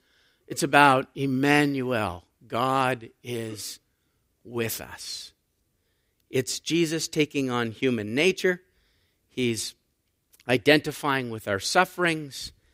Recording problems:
none

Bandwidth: 15.5 kHz